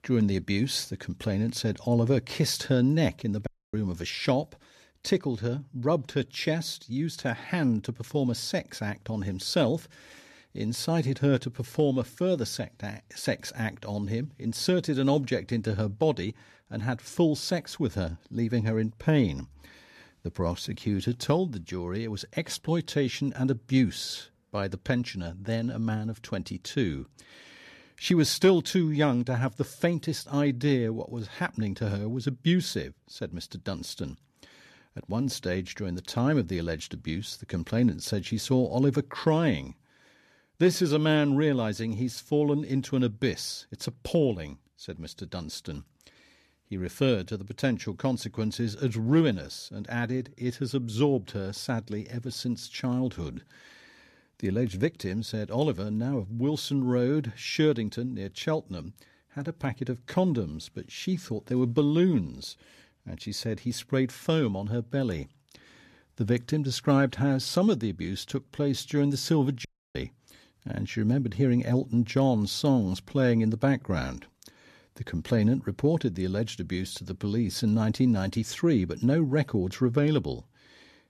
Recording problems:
audio cutting out; at 3.5 s and at 1:10

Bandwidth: 13.5 kHz